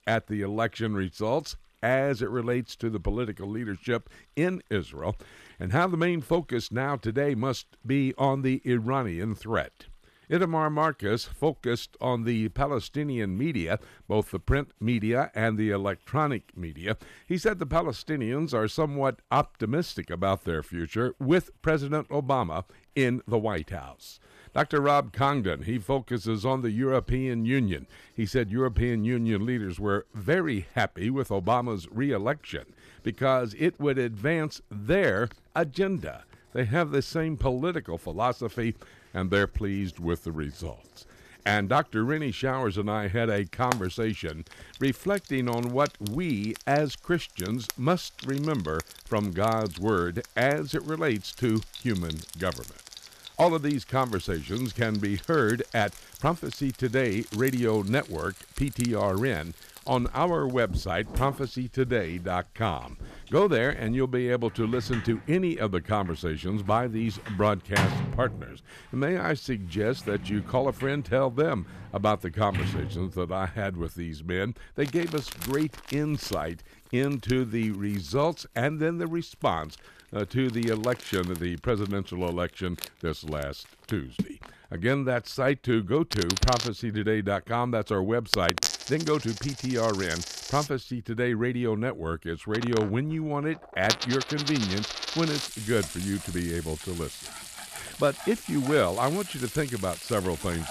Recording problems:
household noises; loud; throughout; 9 dB below the speech

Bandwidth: 14.5 kHz